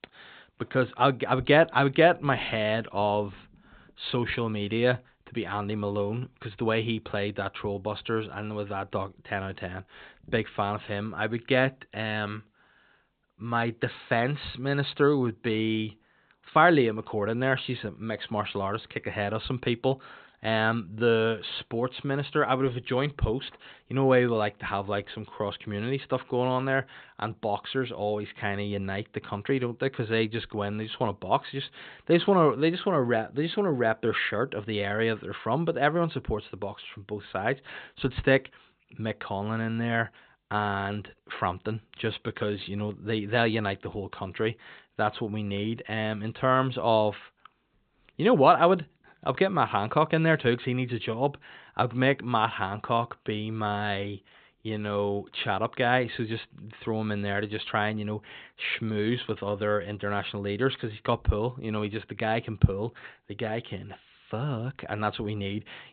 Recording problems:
high frequencies cut off; severe; nothing above 4 kHz

